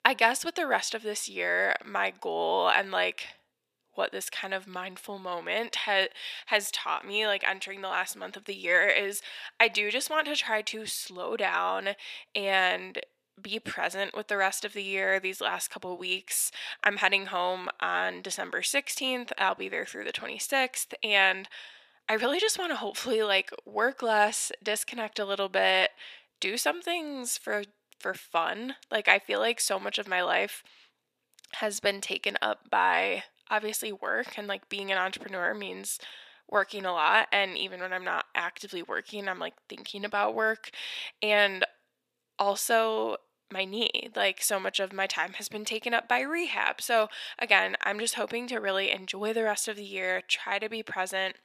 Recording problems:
thin; very; fading below 500 Hz

